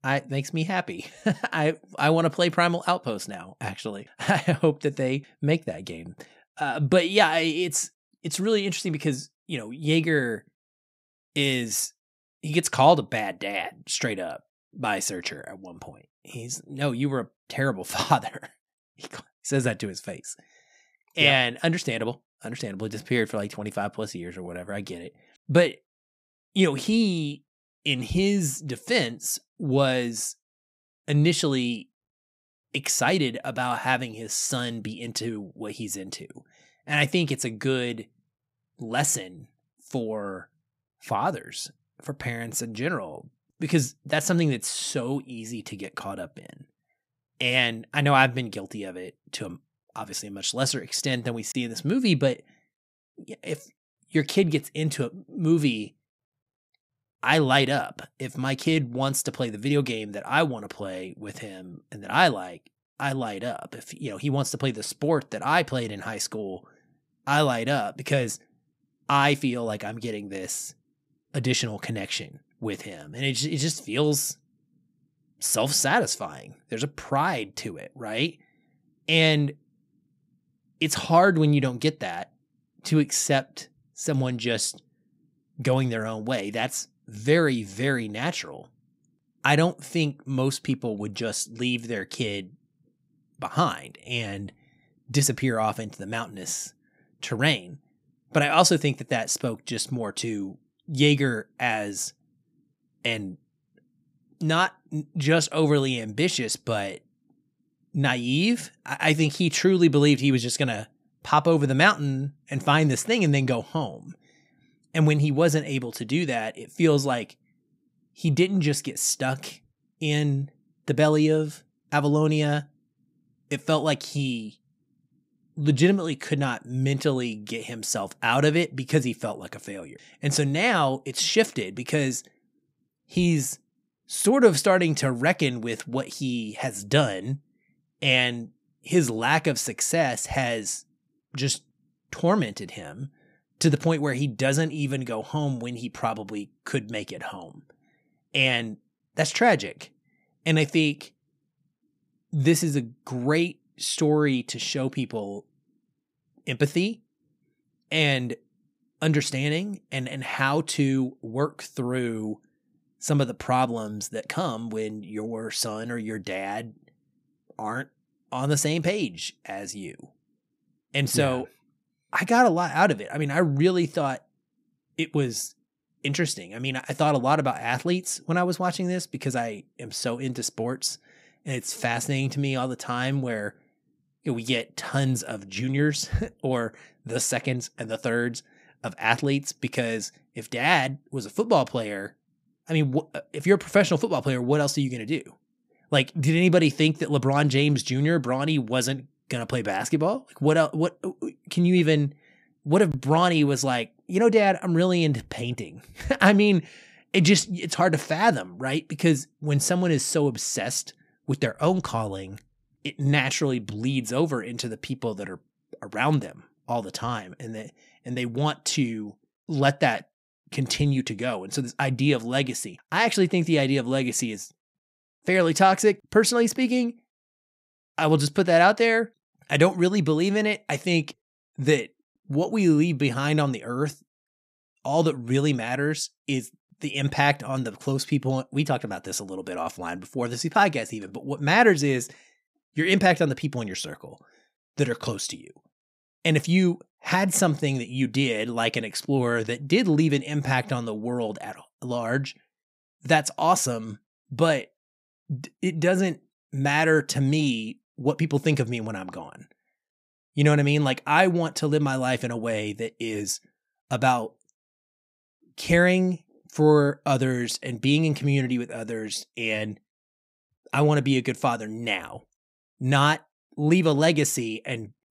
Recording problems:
none

